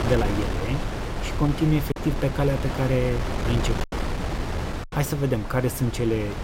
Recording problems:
wind noise on the microphone; heavy; 4 dB below the speech
choppy; occasionally; from 2 to 4 s; 4% of the speech affected

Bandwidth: 16 kHz